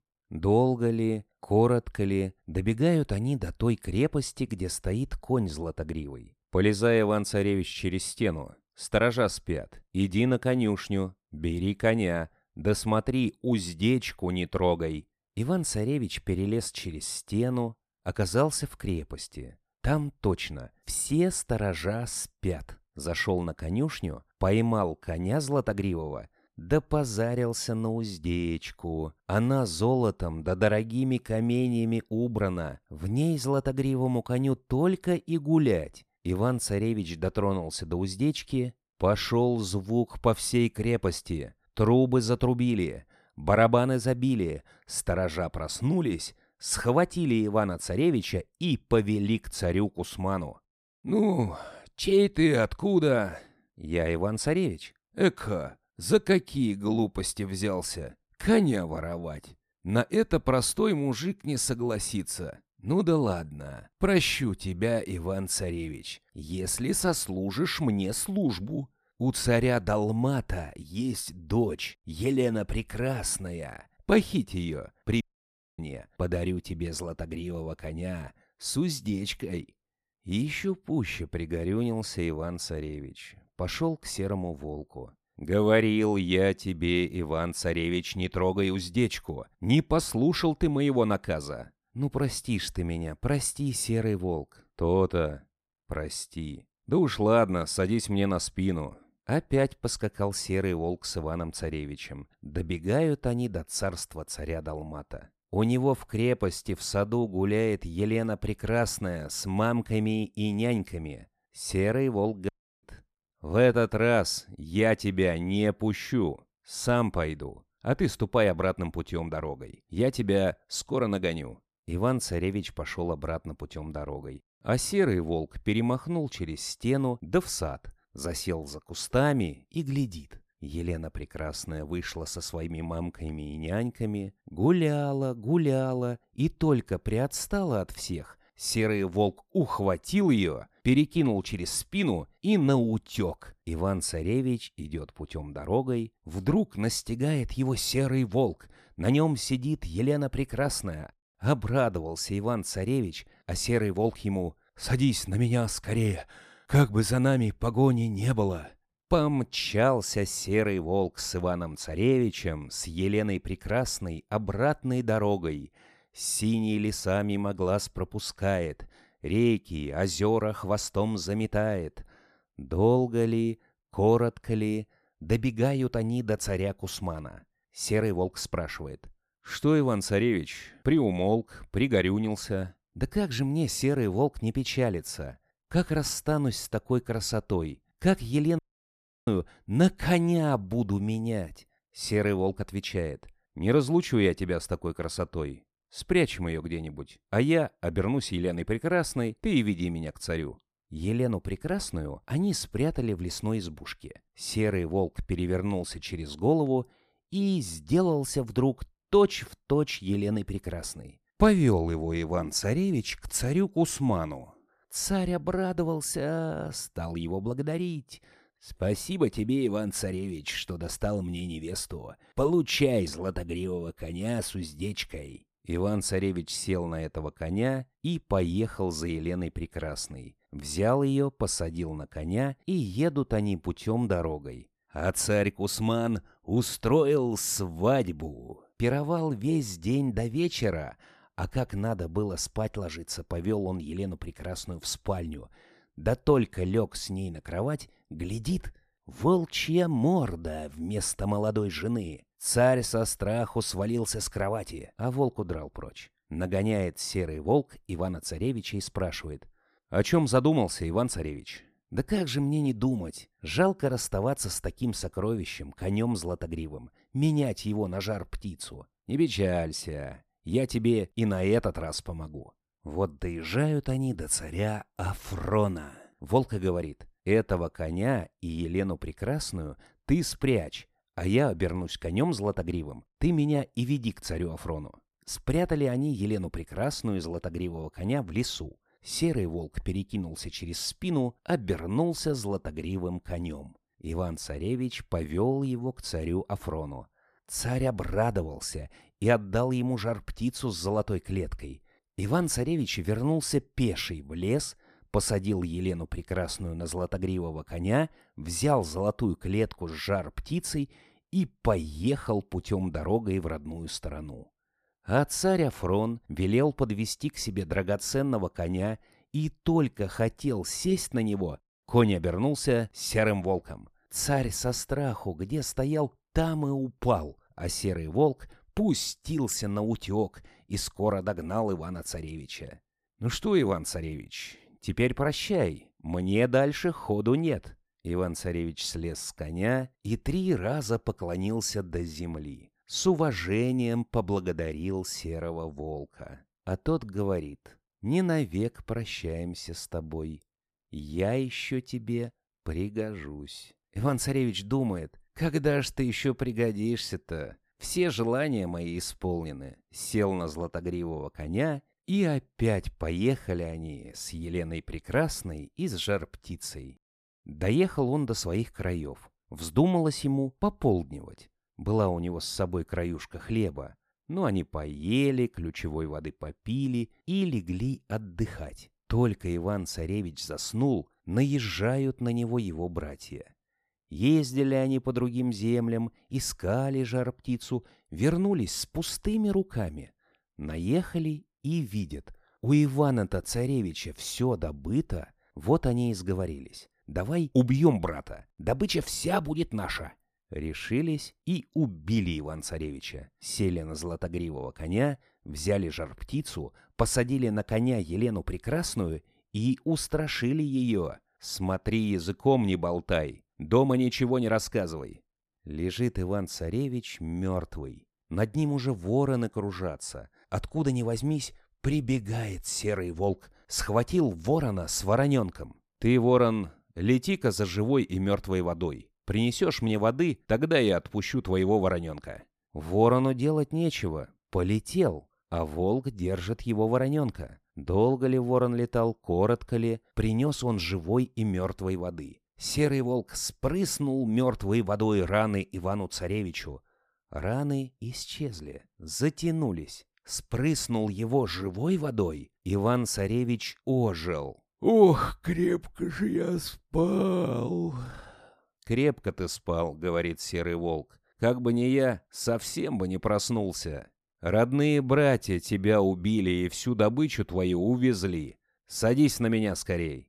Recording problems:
audio cutting out; at 1:15 for 0.5 s, at 1:52 and at 3:09 for 0.5 s

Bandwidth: 14.5 kHz